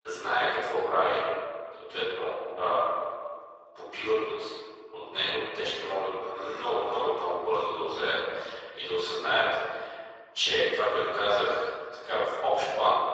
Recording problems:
room echo; strong; dies away in 1.6 s
off-mic speech; far
garbled, watery; badly
thin; very; fading below 350 Hz

